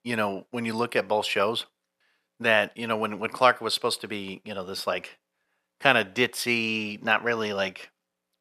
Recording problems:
none

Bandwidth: 13.5 kHz